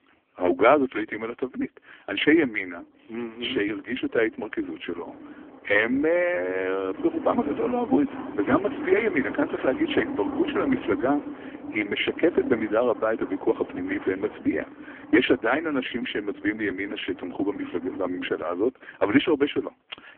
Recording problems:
phone-call audio; poor line; nothing above 3.5 kHz
traffic noise; noticeable; throughout; 10 dB below the speech

